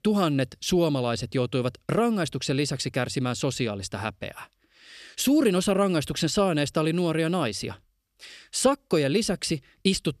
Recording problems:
none

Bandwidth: 13.5 kHz